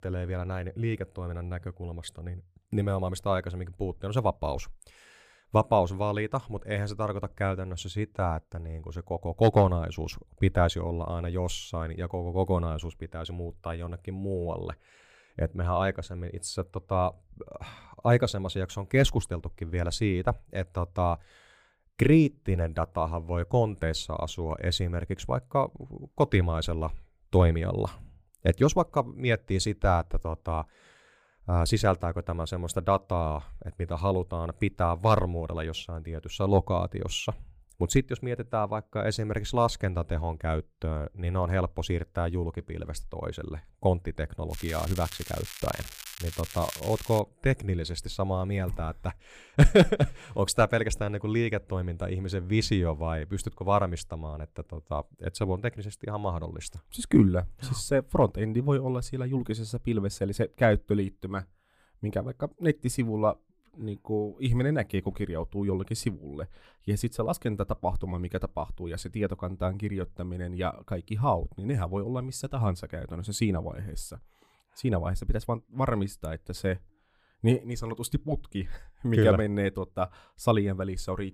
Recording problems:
crackling; noticeable; from 45 to 47 s; 10 dB below the speech

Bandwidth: 15 kHz